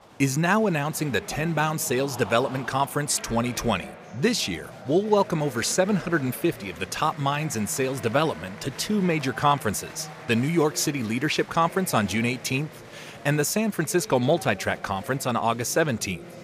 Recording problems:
chatter from many people; noticeable; throughout; 15 dB below the speech

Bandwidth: 15 kHz